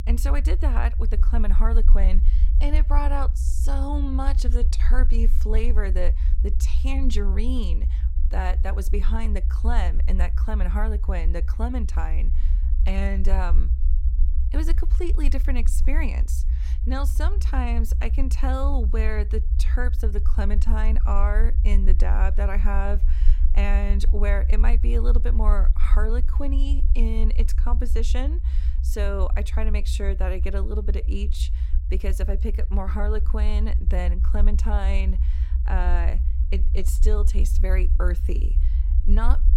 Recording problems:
low rumble; noticeable; throughout; 10 dB below the speech

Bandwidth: 16.5 kHz